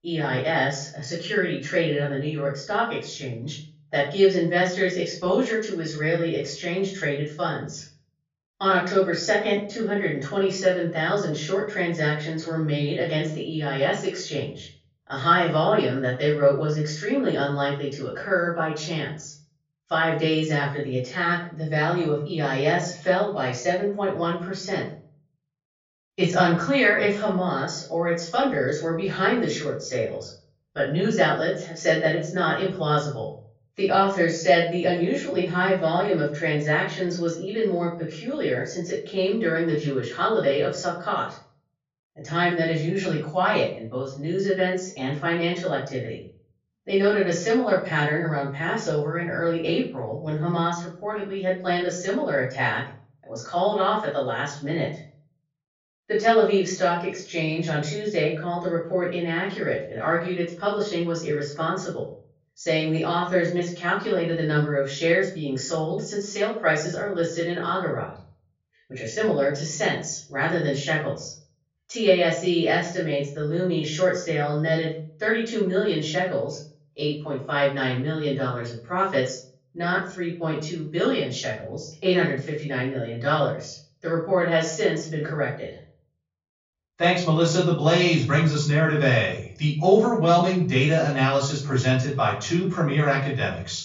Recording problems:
off-mic speech; far
room echo; noticeable; dies away in 0.5 s
high frequencies cut off; noticeable; nothing above 7 kHz

